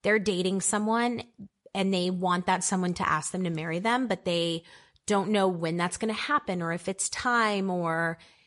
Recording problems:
garbled, watery; slightly; nothing above 10.5 kHz

